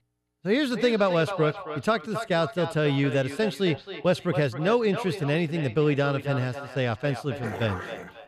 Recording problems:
echo of what is said; strong; throughout; 270 ms later, 10 dB below the speech
dog barking; noticeable; at 7.5 s; peak 9 dB below the speech

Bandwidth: 15 kHz